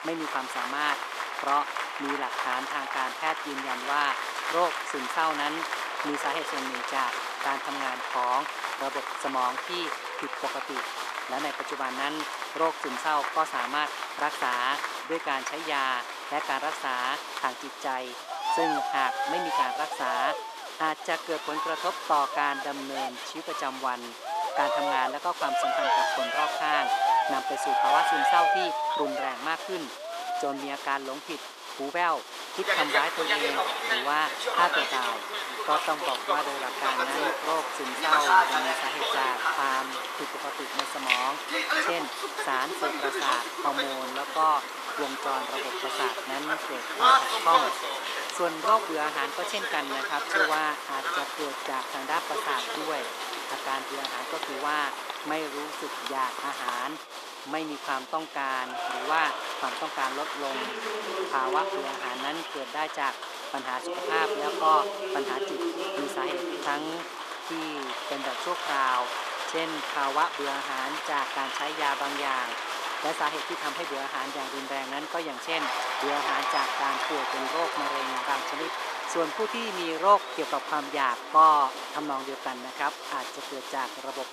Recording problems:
thin; very; fading below 350 Hz
crowd noise; very loud; throughout; as loud as the speech
background chatter; faint; throughout; 2 voices, 30 dB below the speech

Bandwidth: 14.5 kHz